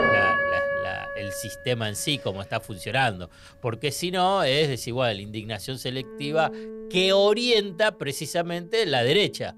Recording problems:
background music; loud; throughout; 3 dB below the speech

